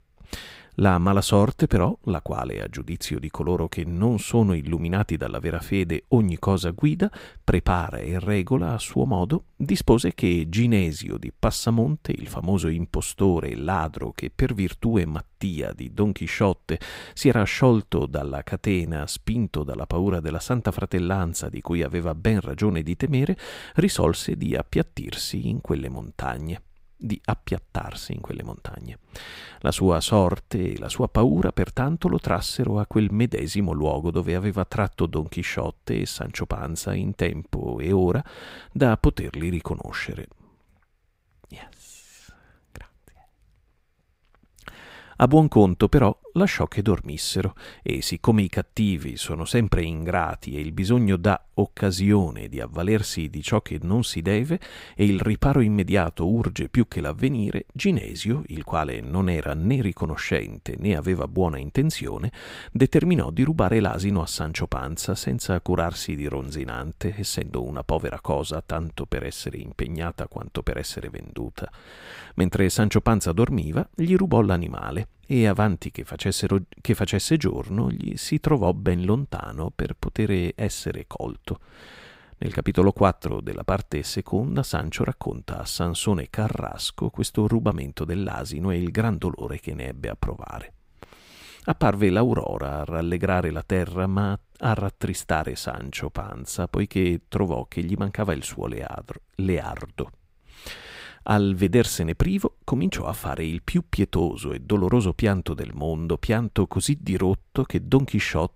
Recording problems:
none

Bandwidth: 15.5 kHz